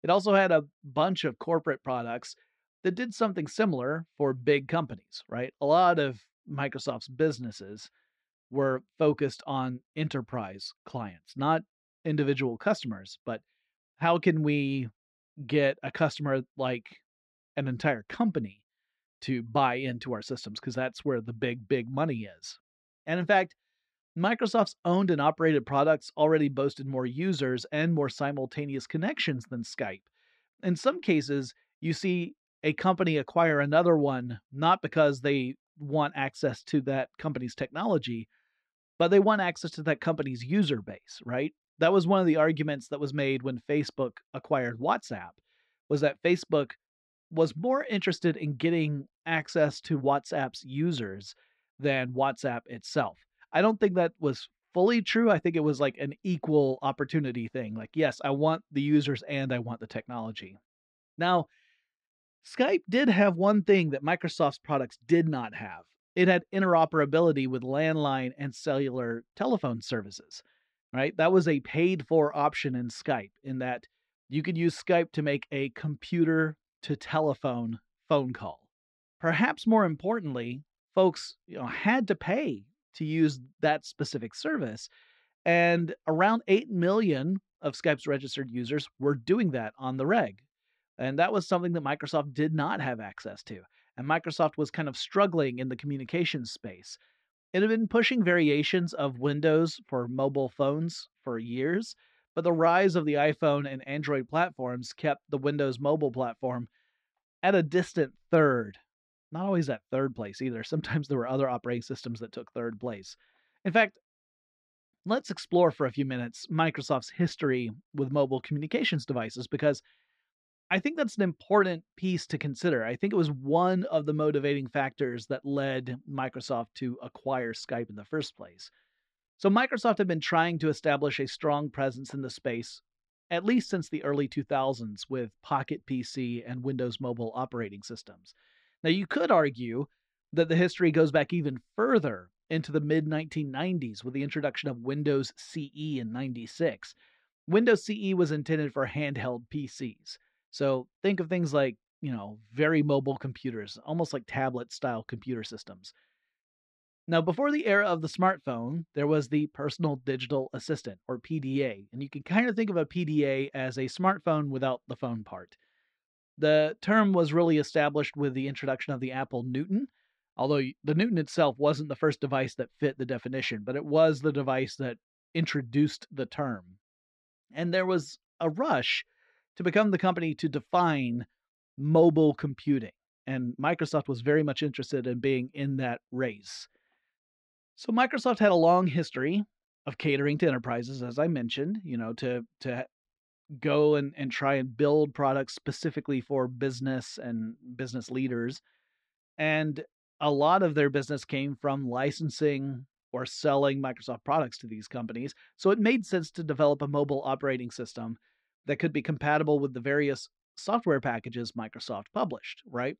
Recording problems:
muffled; slightly; fading above 3.5 kHz

